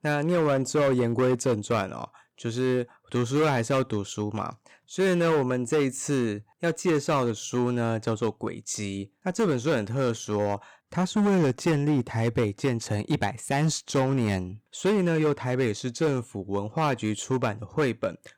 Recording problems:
distortion; slight; 9% of the sound clipped

